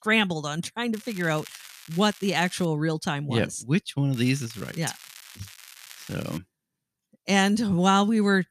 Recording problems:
crackling; noticeable; from 1 to 2.5 s and from 4 to 6.5 s; 20 dB below the speech

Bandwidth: 14.5 kHz